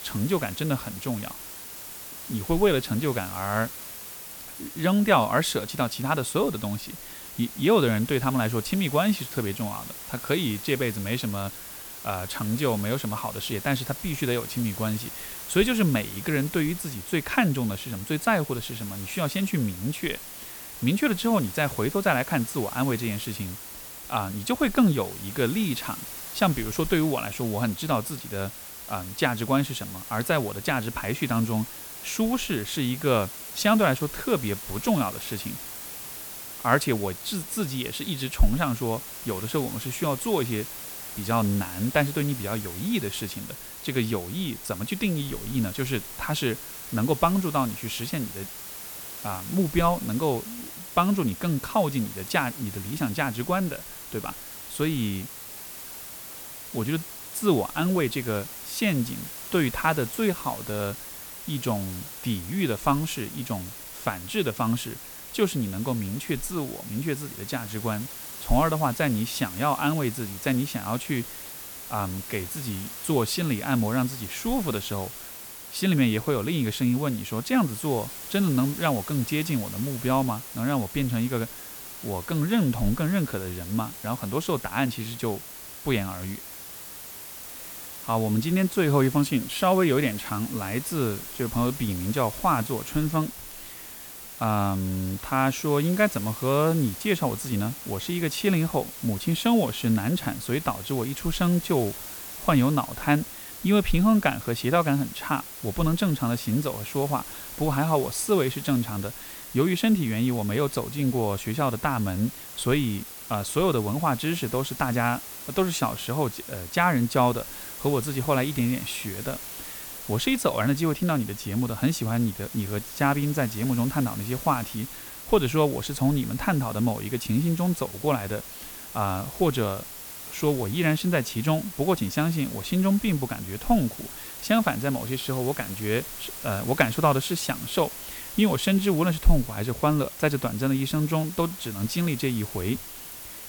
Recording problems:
hiss; noticeable; throughout; 10 dB below the speech

